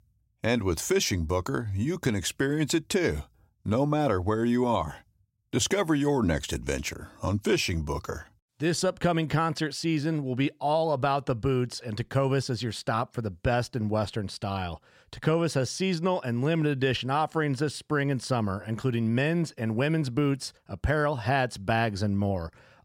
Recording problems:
none

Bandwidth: 16 kHz